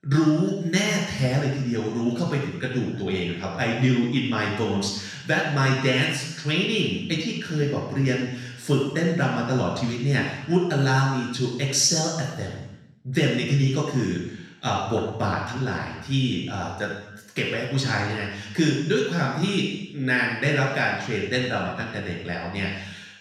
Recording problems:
off-mic speech; far
room echo; noticeable; dies away in 0.9 s

